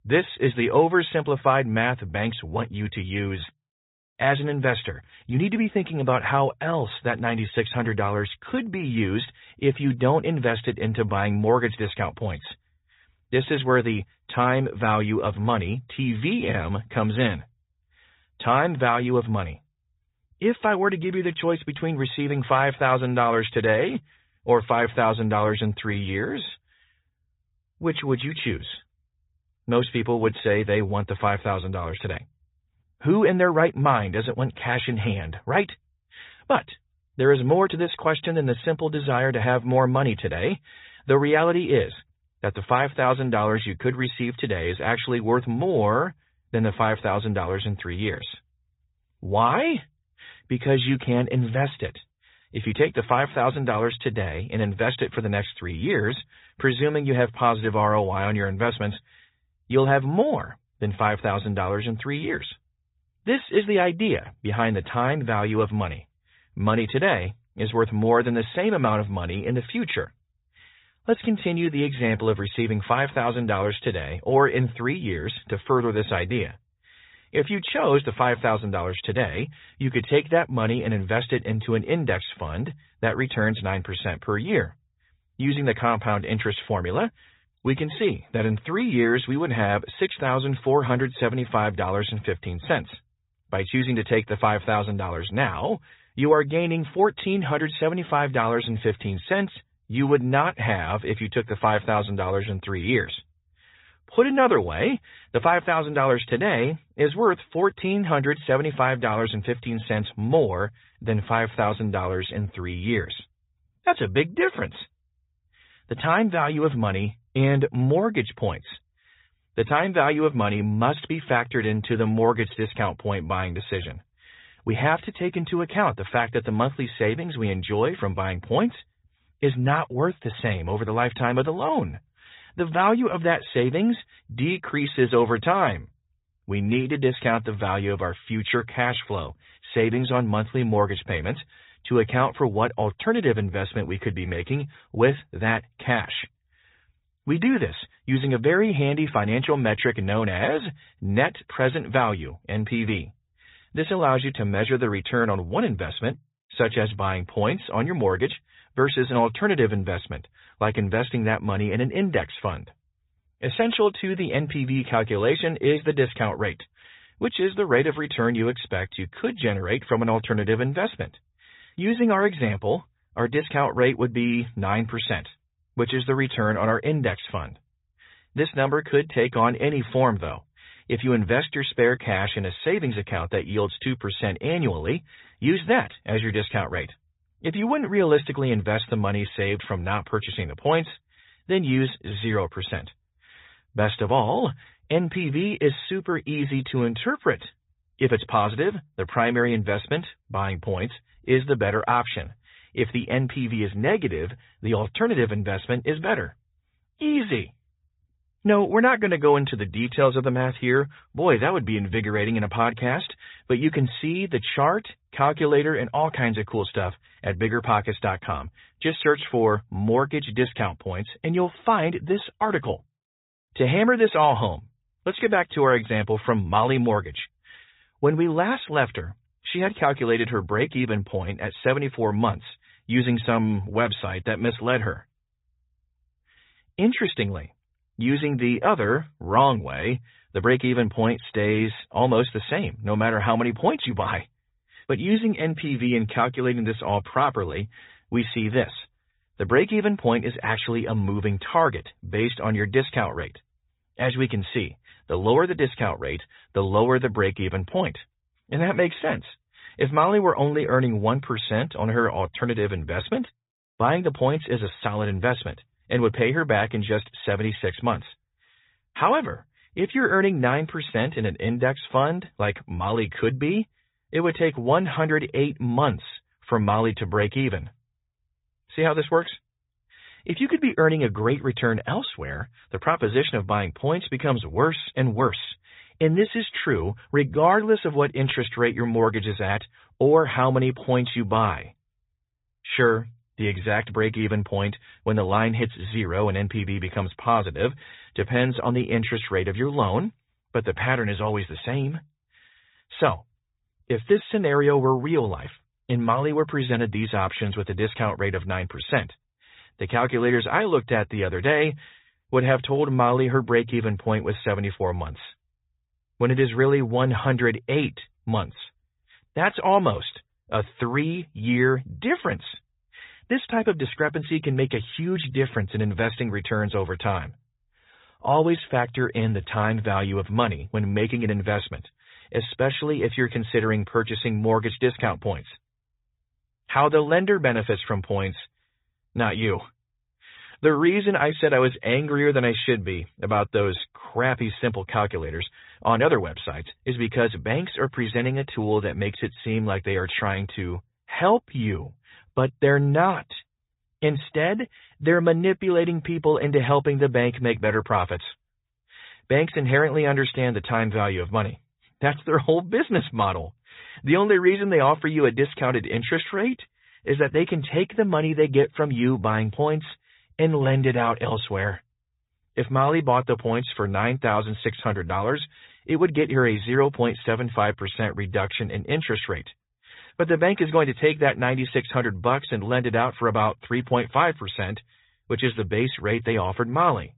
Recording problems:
high frequencies cut off; severe; nothing above 4 kHz
garbled, watery; slightly

